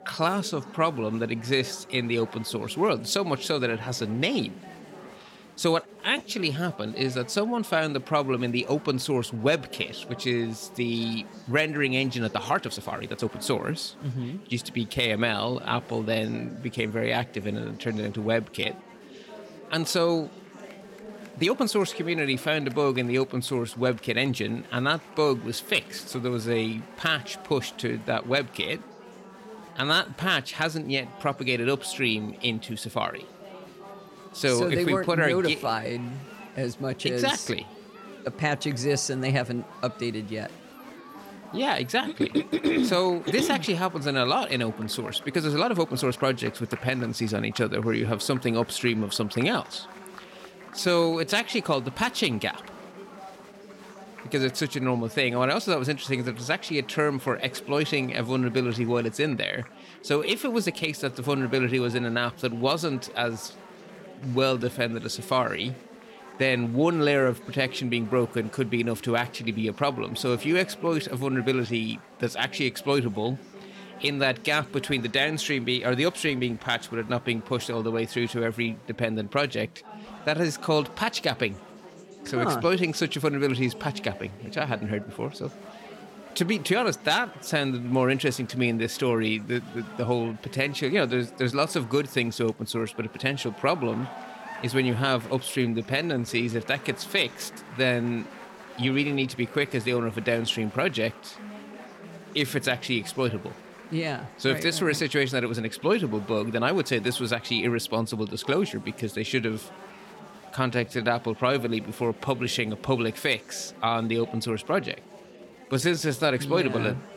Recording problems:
chatter from many people; noticeable; throughout; 20 dB below the speech
uneven, jittery; strongly; from 12 s to 1:56

